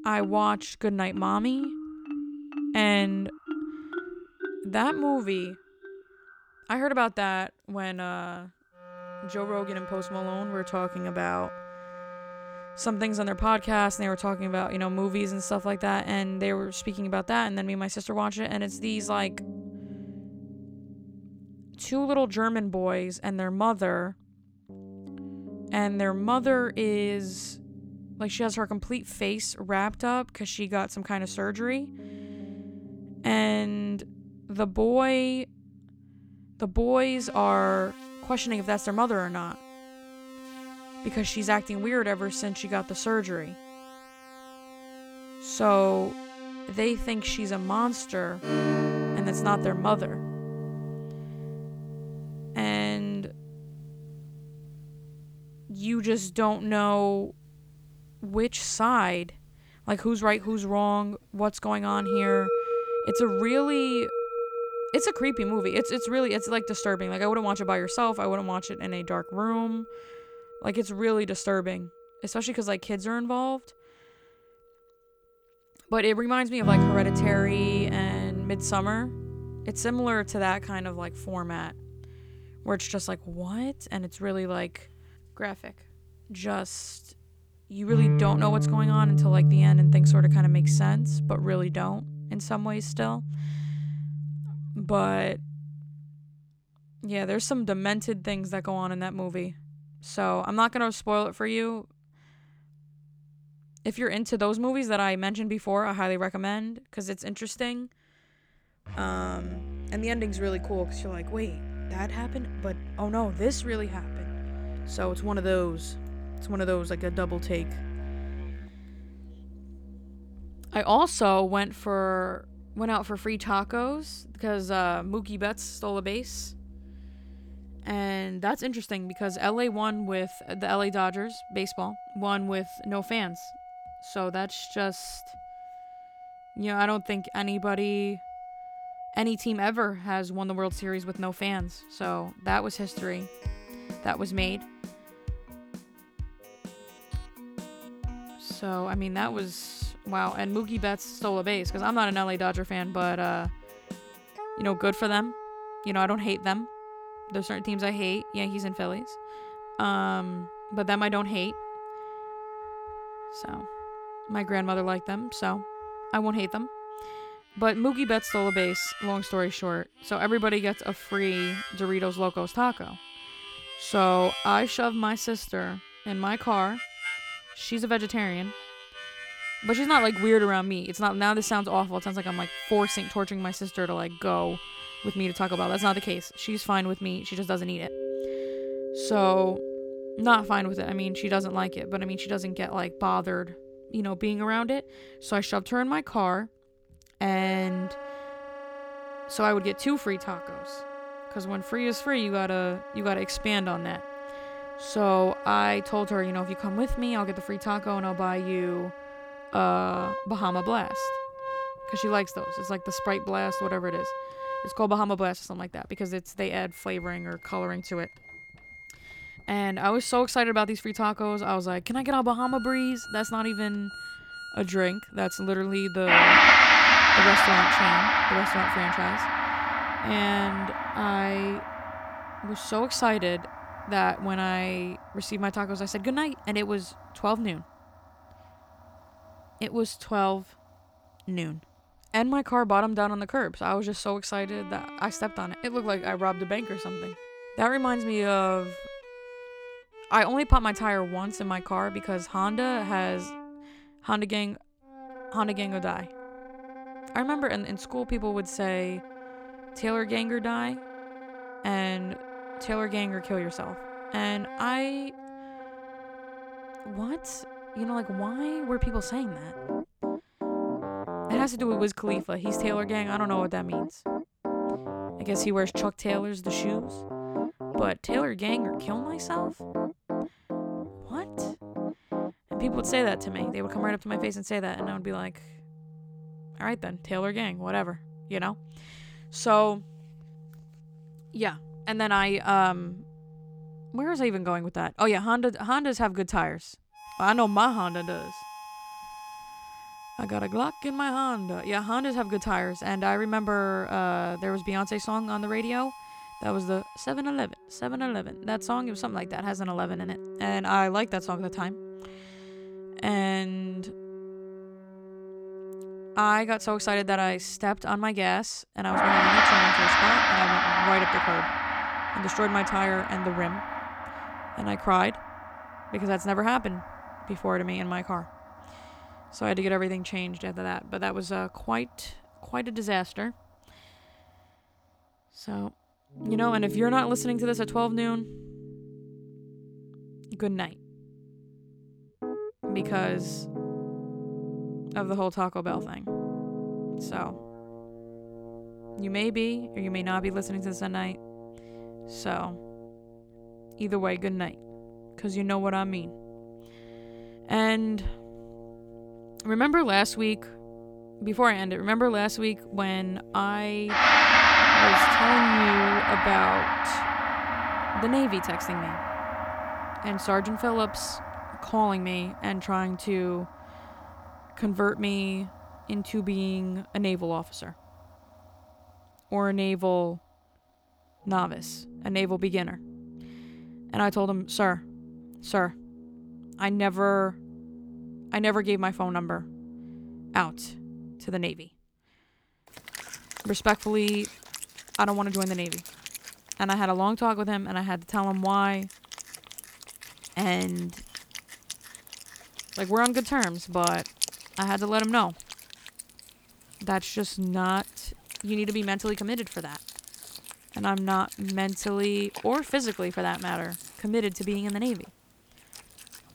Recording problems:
background music; loud; throughout; 1 dB below the speech

